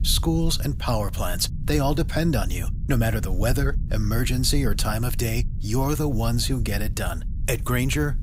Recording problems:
low rumble; noticeable; throughout; 20 dB below the speech

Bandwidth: 15.5 kHz